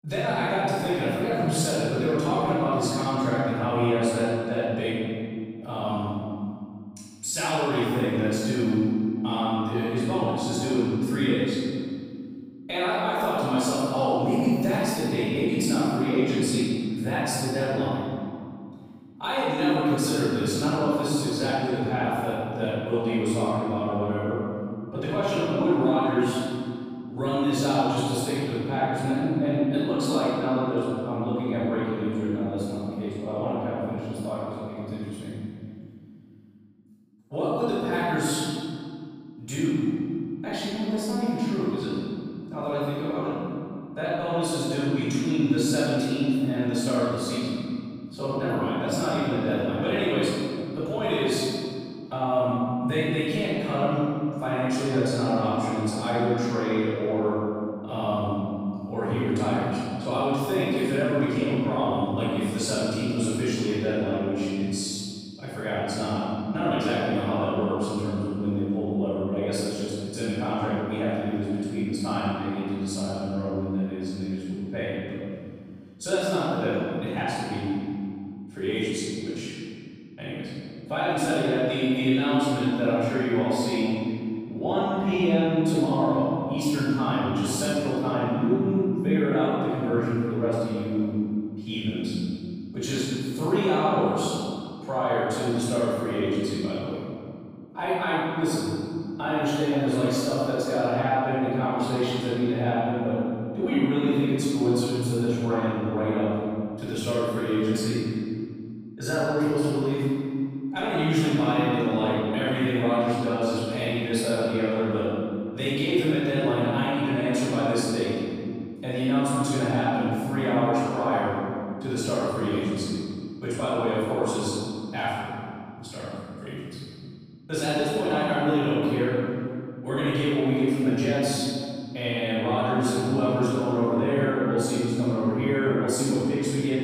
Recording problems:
room echo; strong; dies away in 2.4 s
off-mic speech; far

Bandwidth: 15.5 kHz